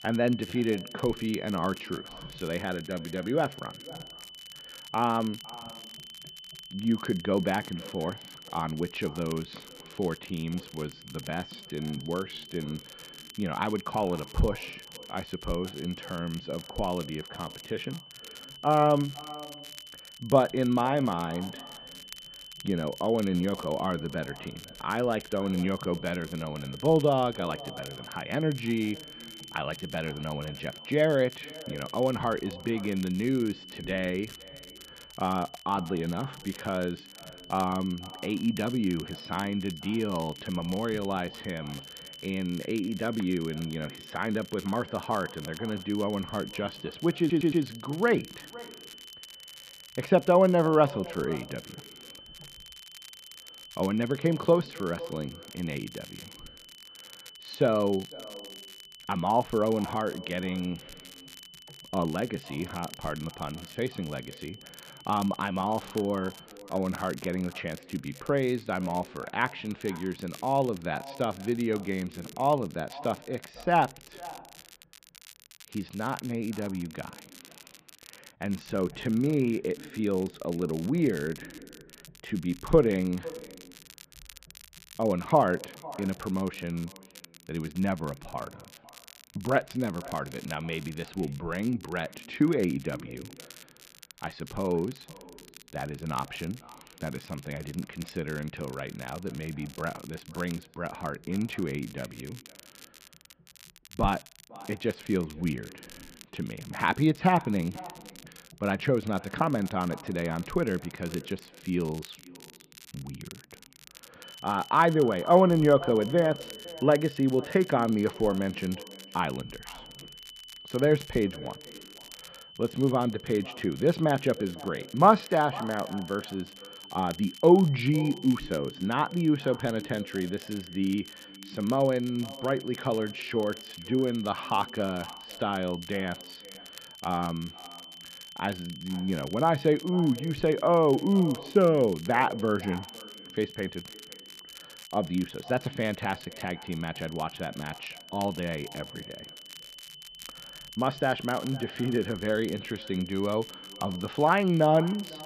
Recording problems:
muffled; very; fading above 3 kHz
echo of what is said; faint; throughout; 500 ms later, 20 dB below the speech
high-pitched whine; noticeable; until 1:06 and from 1:54 on; 3 kHz, 15 dB below the speech
crackle, like an old record; faint; 20 dB below the speech
audio stuttering; at 47 s

